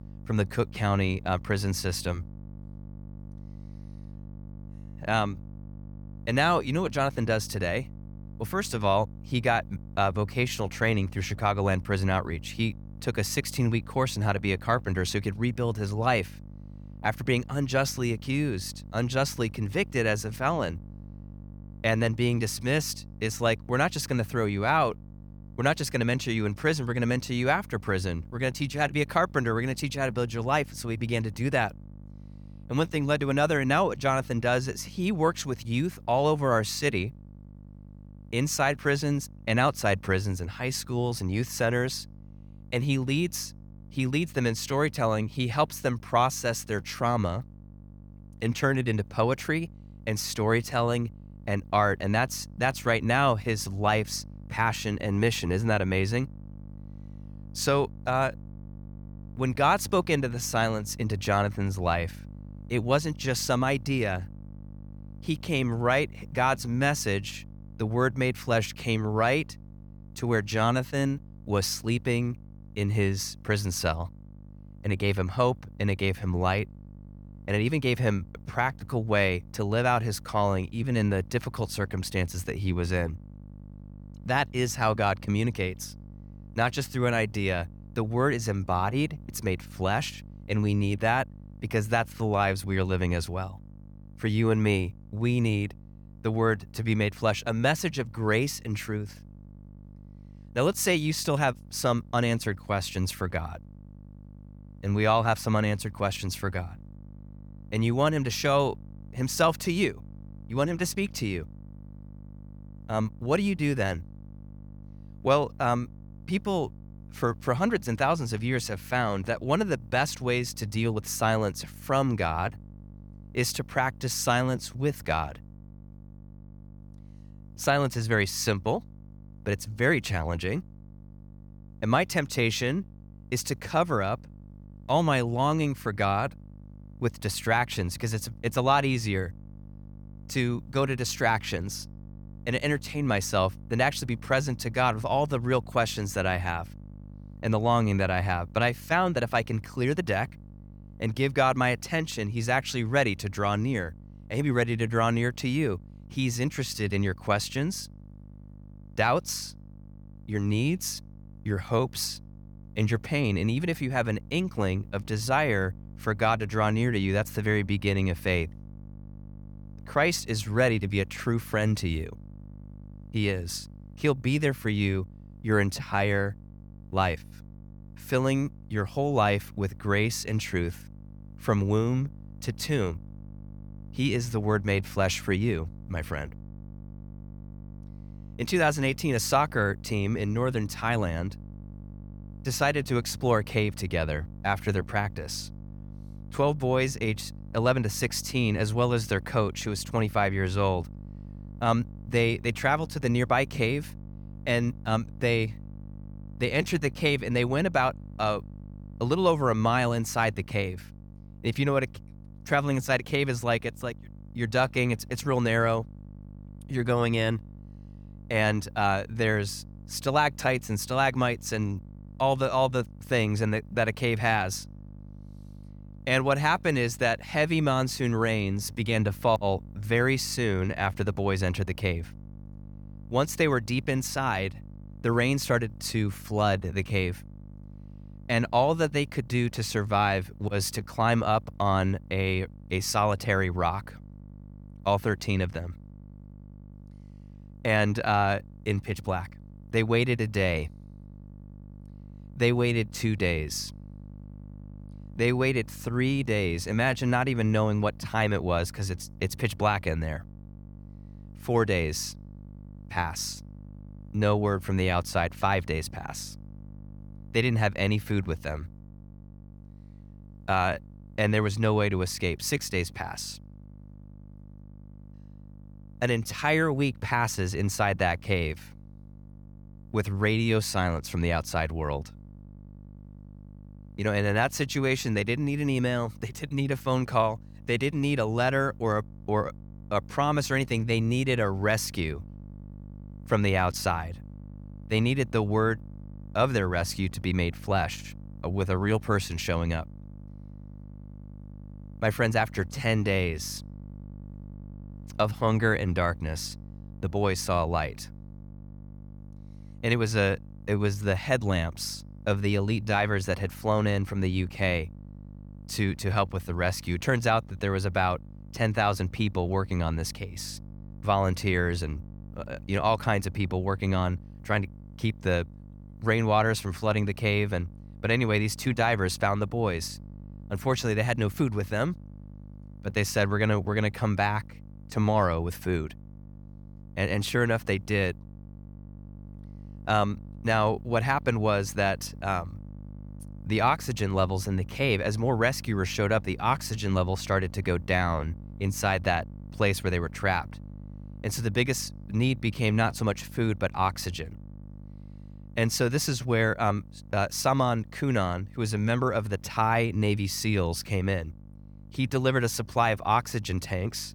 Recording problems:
electrical hum; faint; throughout; 50 Hz, 30 dB below the speech

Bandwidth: 18.5 kHz